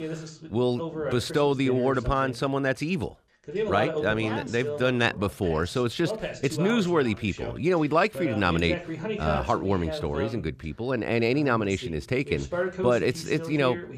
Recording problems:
voice in the background; loud; throughout; 8 dB below the speech

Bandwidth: 14.5 kHz